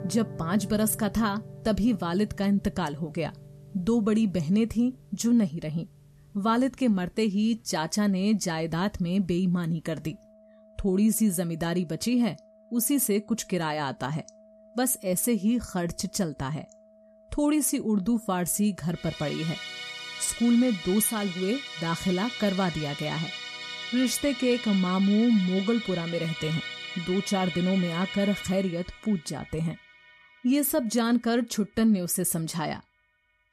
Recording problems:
background music; noticeable; throughout; 10 dB below the speech

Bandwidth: 13.5 kHz